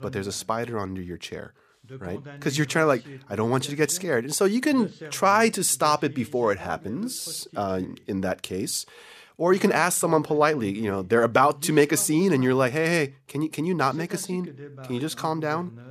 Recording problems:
voice in the background; noticeable; throughout; 20 dB below the speech

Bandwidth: 14.5 kHz